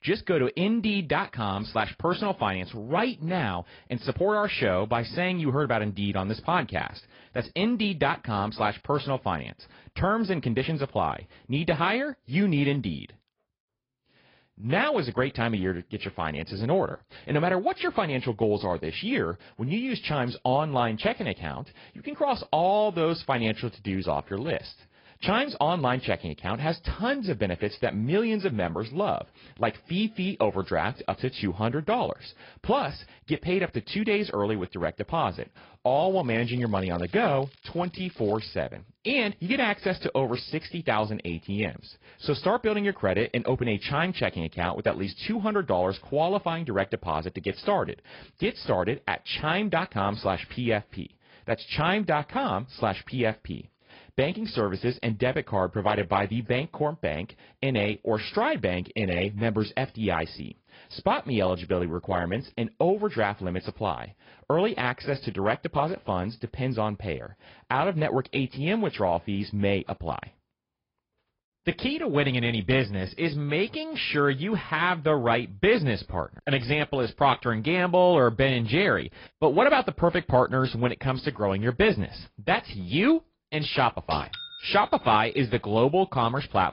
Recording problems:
high frequencies cut off; noticeable; nothing above 5 kHz
garbled, watery; slightly
crackling; faint; from 36 to 39 s; 30 dB below the speech

